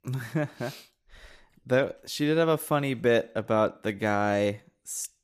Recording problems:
none

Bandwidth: 14.5 kHz